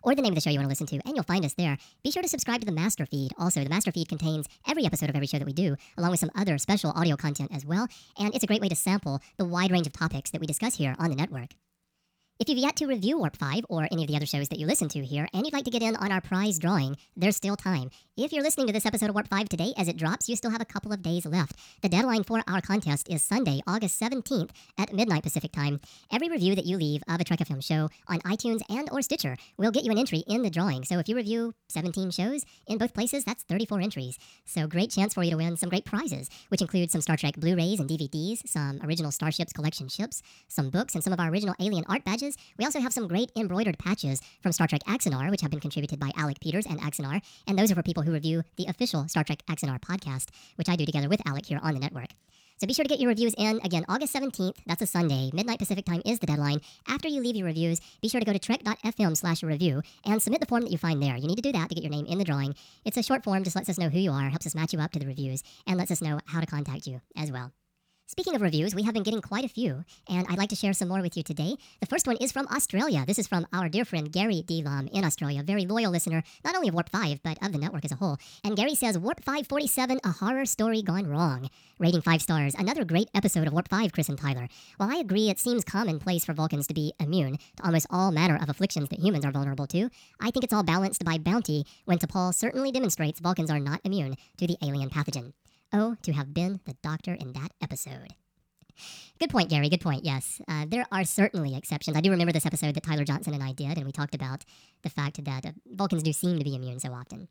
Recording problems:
wrong speed and pitch; too fast and too high; 1.5 times normal speed

